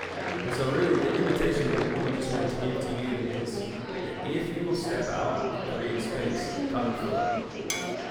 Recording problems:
off-mic speech; far
room echo; noticeable; dies away in 1.9 s
chatter from many people; loud; throughout; 2 dB below the speech
background music; noticeable; until 4 s; 10 dB below the speech
clattering dishes; noticeable; at 7.5 s; peak 2 dB below the speech

